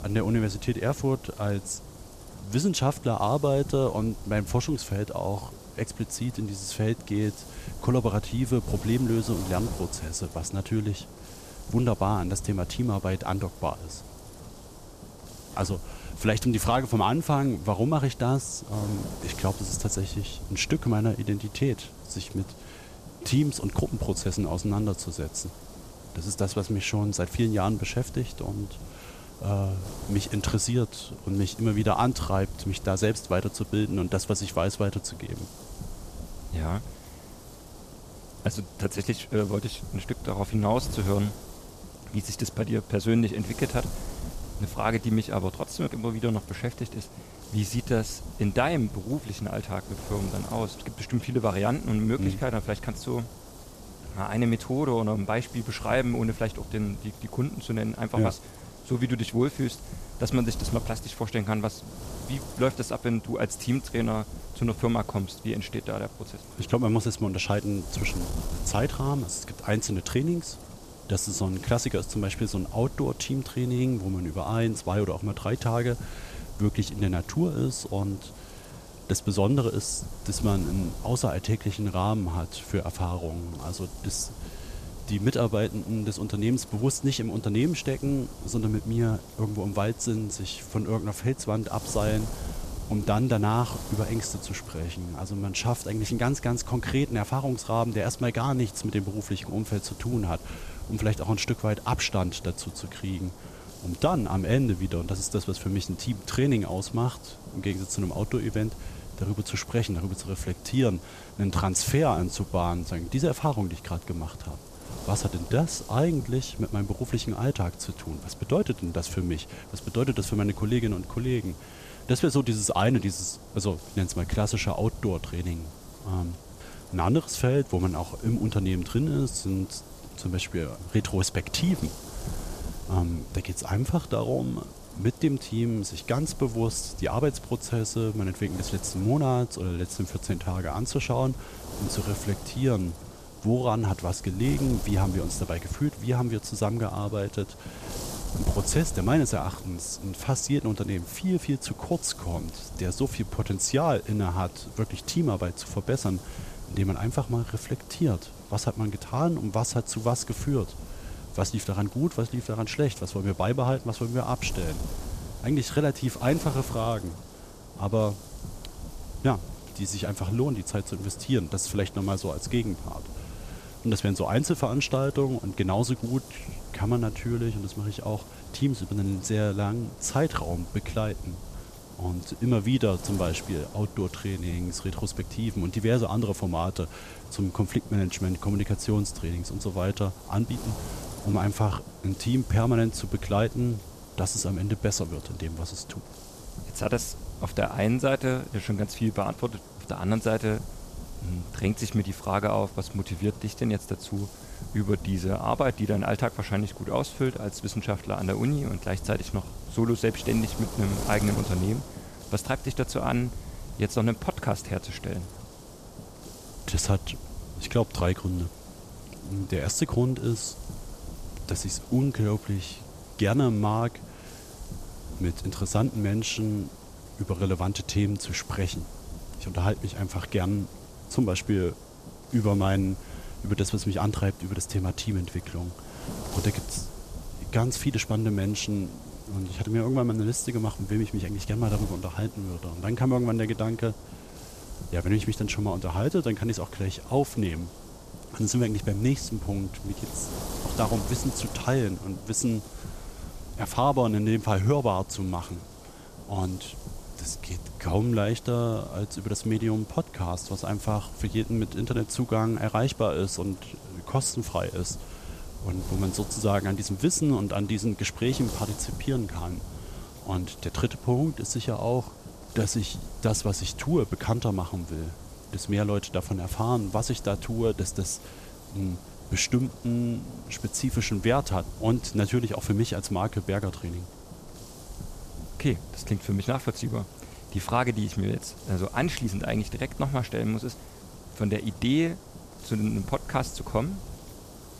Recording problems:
wind noise on the microphone; occasional gusts; 15 dB below the speech

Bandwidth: 14.5 kHz